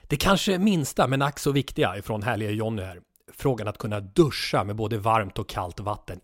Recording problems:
none

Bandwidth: 16 kHz